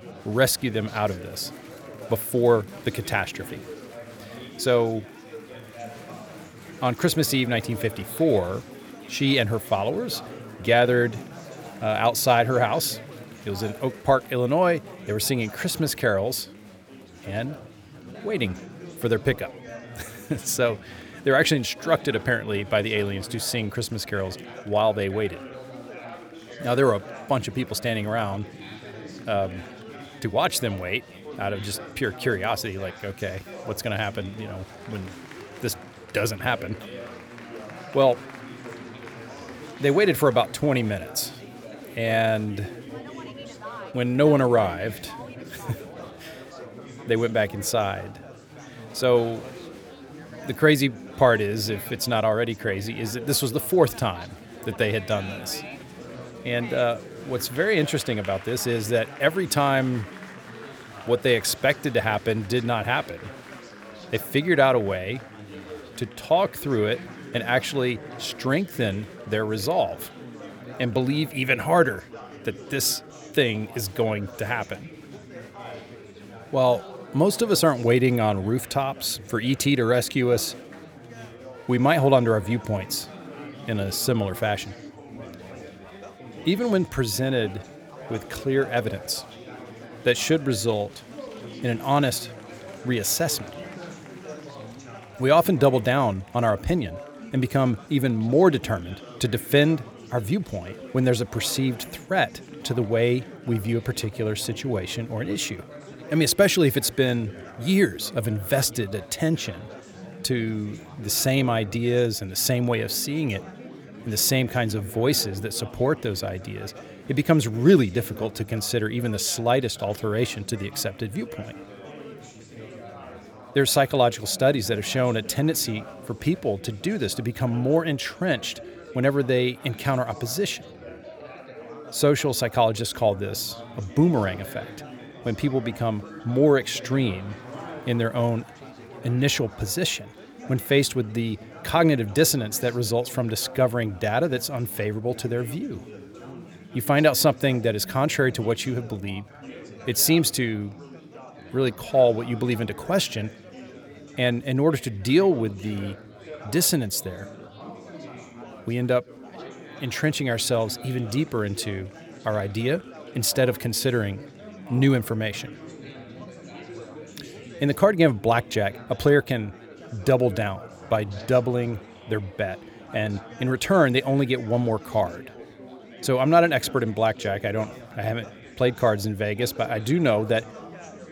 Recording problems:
chatter from many people; noticeable; throughout; 15 dB below the speech

